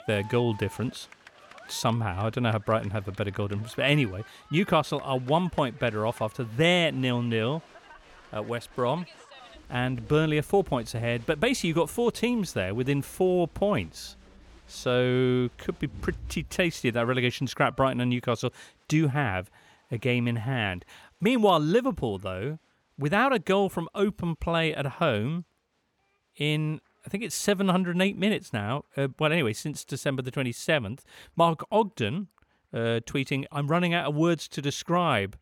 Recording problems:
crowd noise; faint; throughout; 25 dB below the speech

